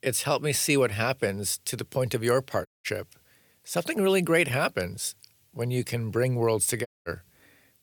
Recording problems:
audio cutting out; at 2.5 s and at 7 s

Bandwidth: 18.5 kHz